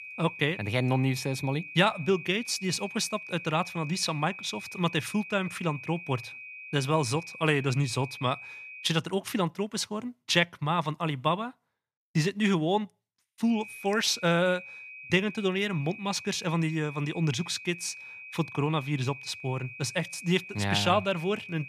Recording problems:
high-pitched whine; noticeable; until 9 s and from 13 s on; 2.5 kHz, 10 dB below the speech

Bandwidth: 14.5 kHz